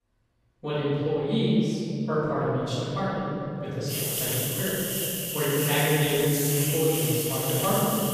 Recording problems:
room echo; strong; dies away in 2.8 s
off-mic speech; far
hiss; loud; from 4 s on; 1 dB below the speech

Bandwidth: 14.5 kHz